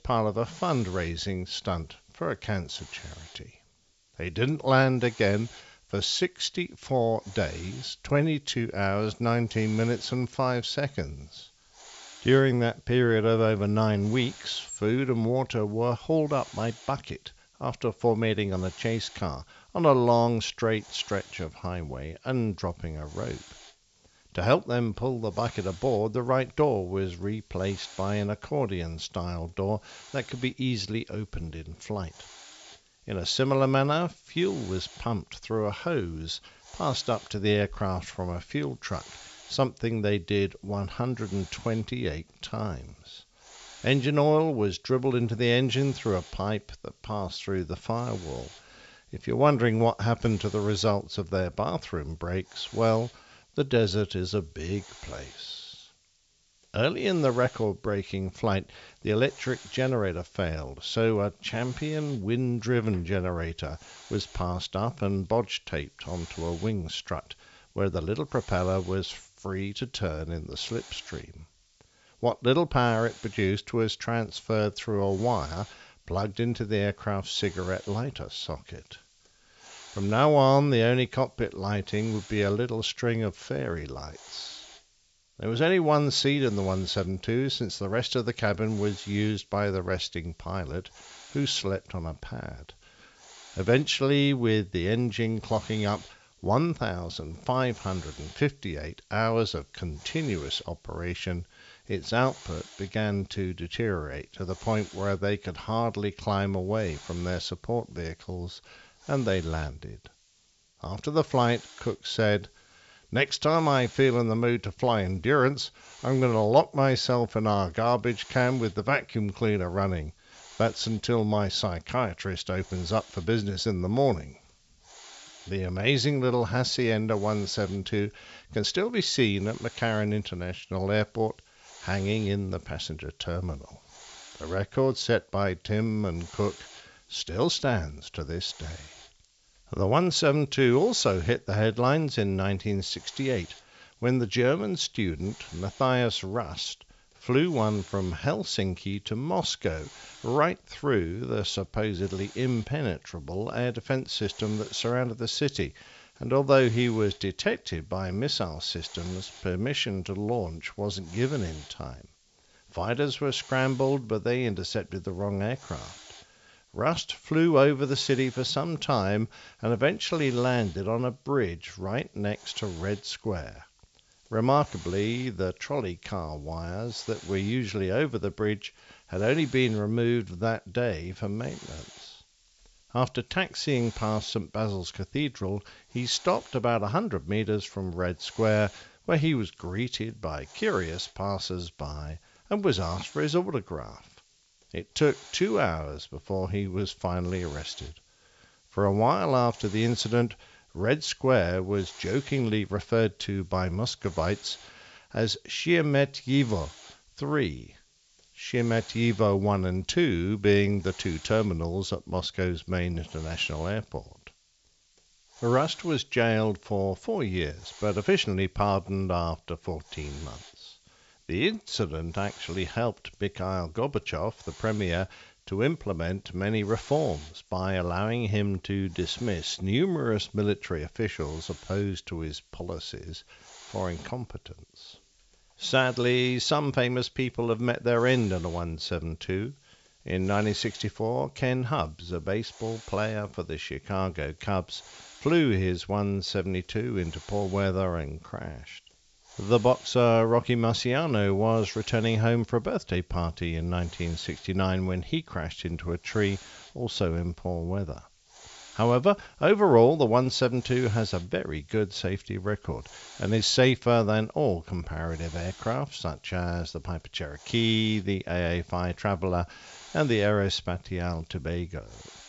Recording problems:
high frequencies cut off; noticeable; nothing above 8 kHz
hiss; faint; throughout; 20 dB below the speech

